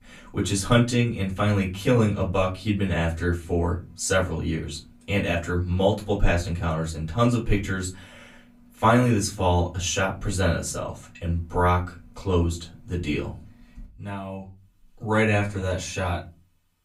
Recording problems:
off-mic speech; far
room echo; very slight; dies away in 0.3 s

